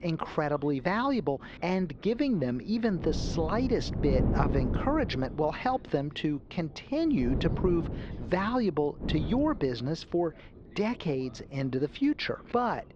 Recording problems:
muffled; slightly; fading above 4 kHz
wind noise on the microphone; heavy; 10 dB below the speech
voice in the background; faint; throughout; 25 dB below the speech

